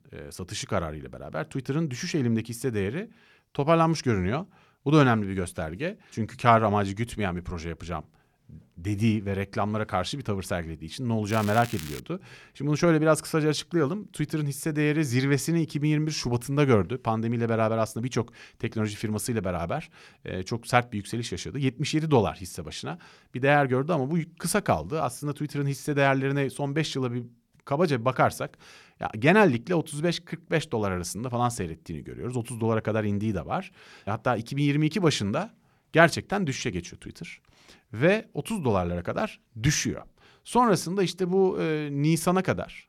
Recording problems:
crackling; noticeable; at 11 s; 15 dB below the speech

